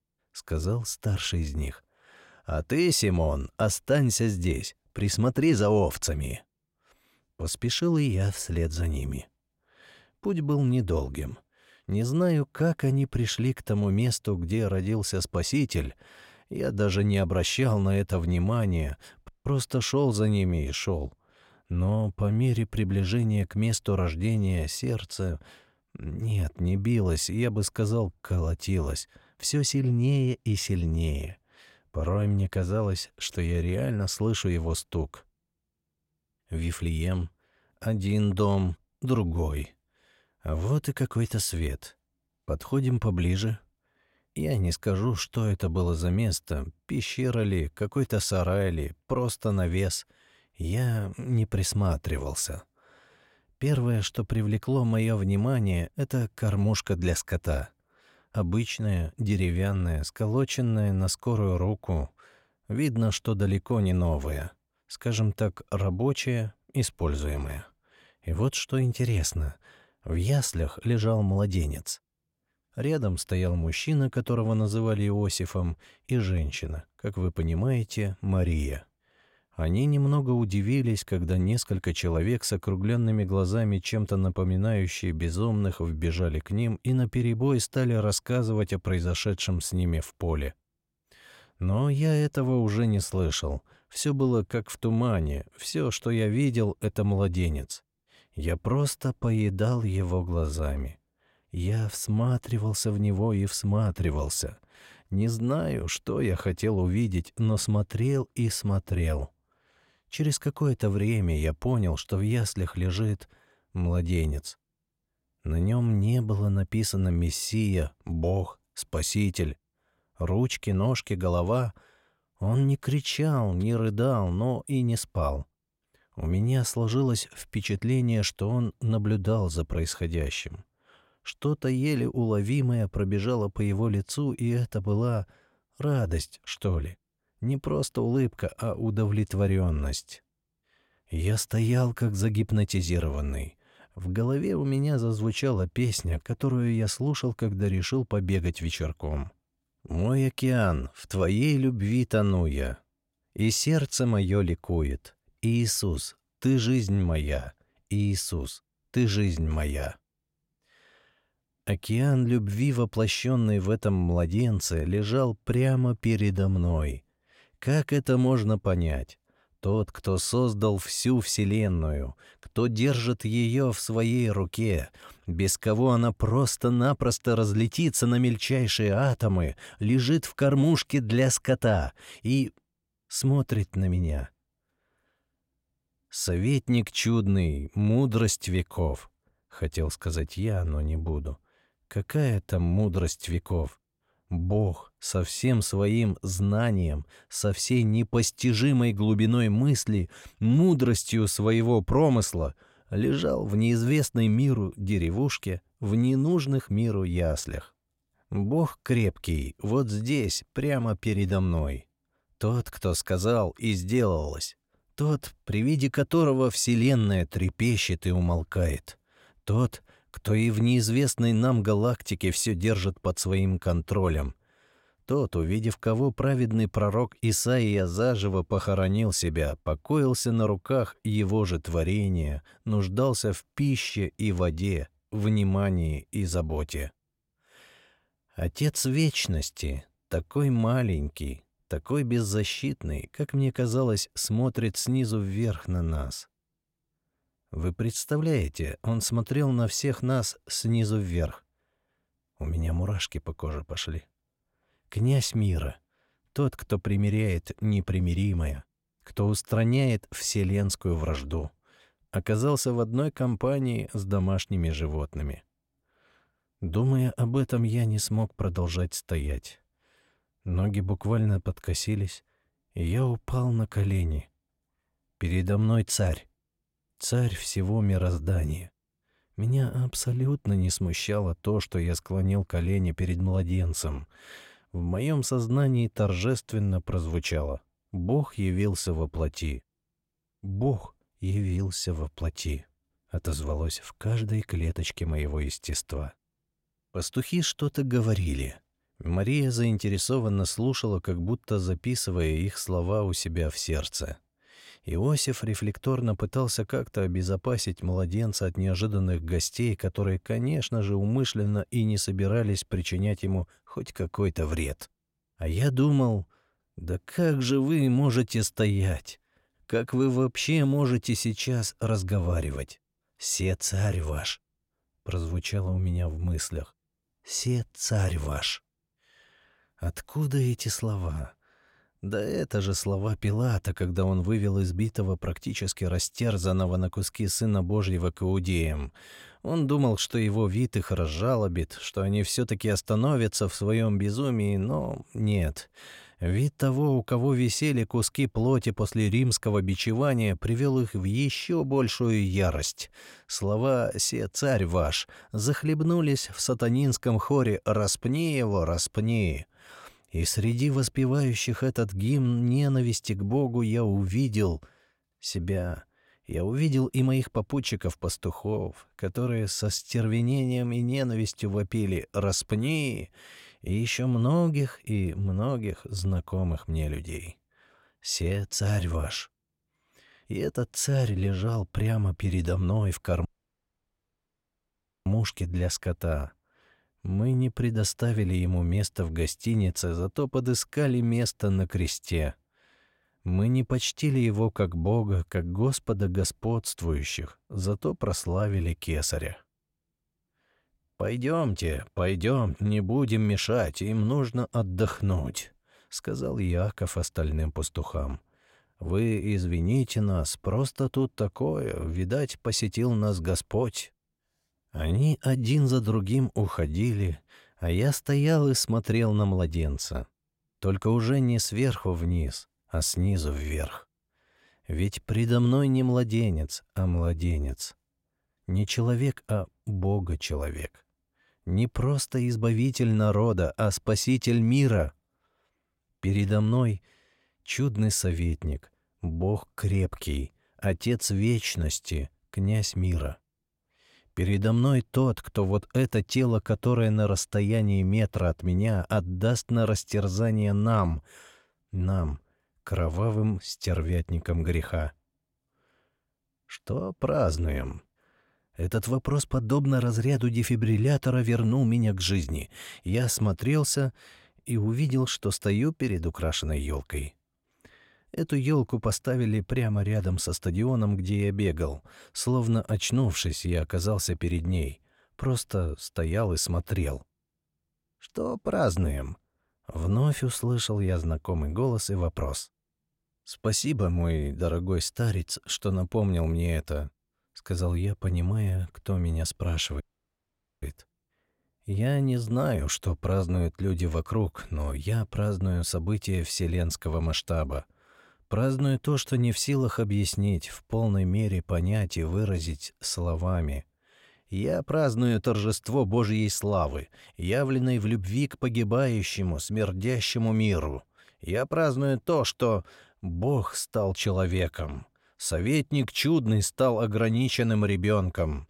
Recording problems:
audio cutting out; at 19 s, at 6:23 for 2 s and at 8:10 for 1 s

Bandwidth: 16 kHz